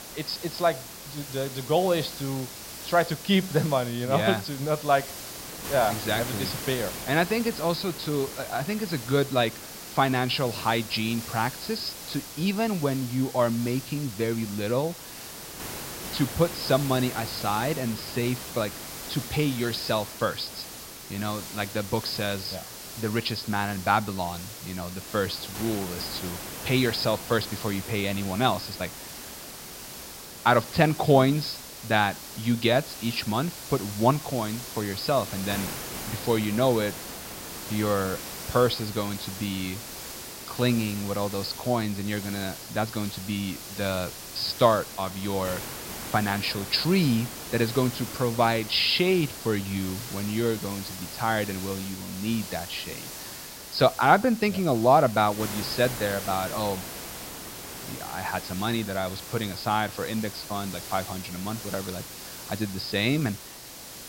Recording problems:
high frequencies cut off; noticeable; nothing above 5.5 kHz
hiss; loud; throughout; 10 dB below the speech

